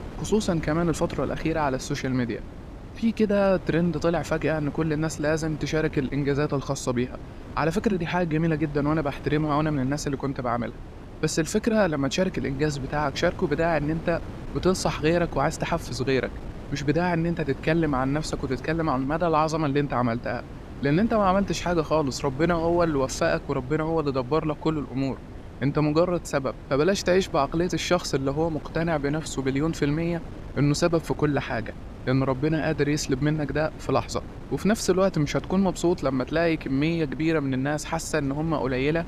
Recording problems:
wind noise on the microphone; occasional gusts; 20 dB below the speech

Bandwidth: 14.5 kHz